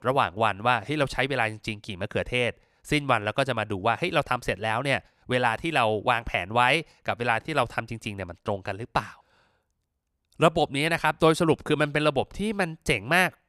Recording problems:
none

